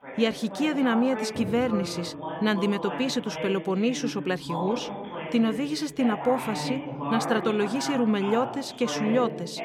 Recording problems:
background chatter; loud; throughout; 2 voices, 7 dB below the speech

